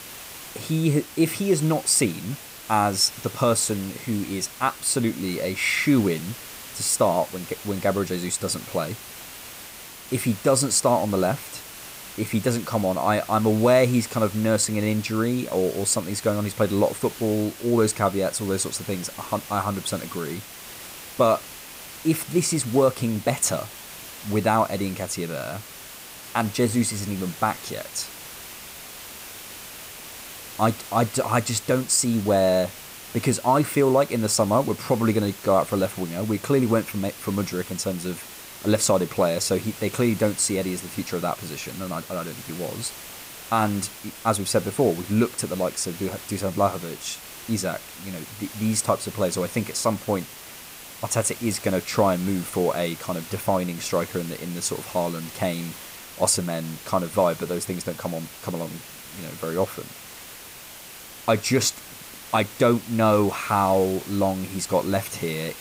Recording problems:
hiss; noticeable; throughout; 15 dB below the speech

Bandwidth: 15.5 kHz